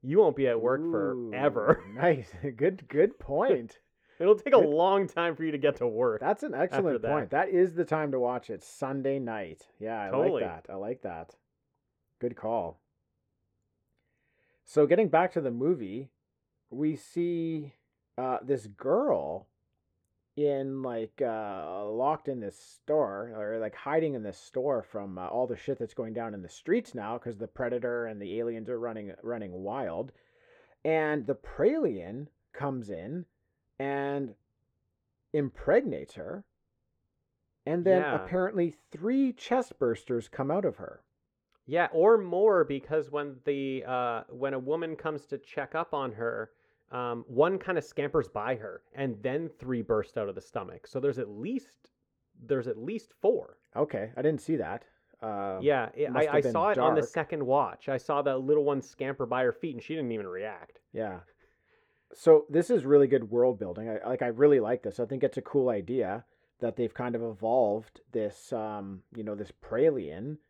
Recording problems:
muffled; very; fading above 3.5 kHz

